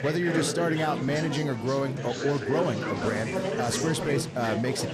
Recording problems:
chatter from many people; loud; throughout; 2 dB below the speech

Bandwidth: 14.5 kHz